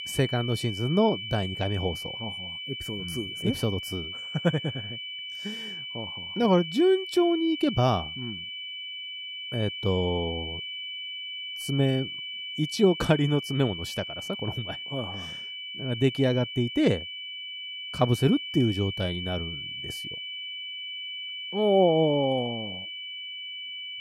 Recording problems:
high-pitched whine; loud; throughout; 3 kHz, 7 dB below the speech

